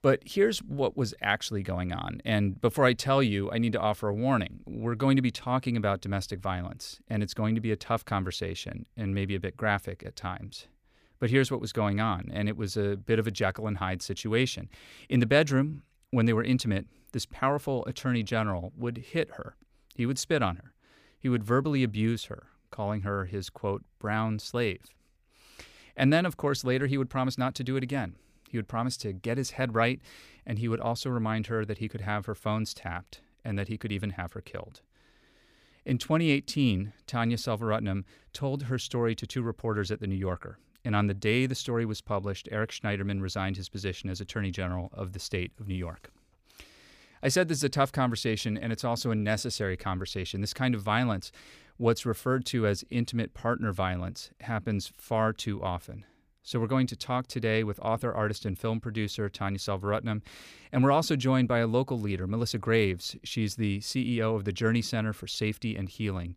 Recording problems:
none

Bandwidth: 15 kHz